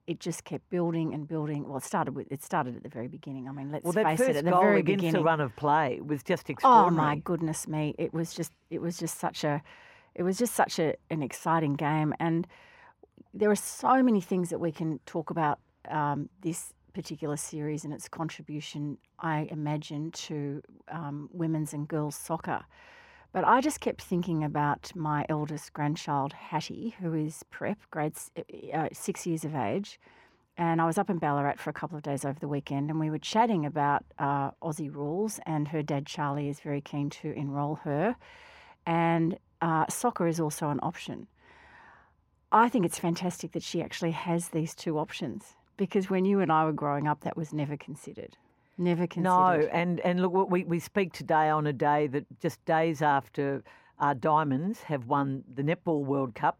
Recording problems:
muffled; slightly; fading above 2.5 kHz

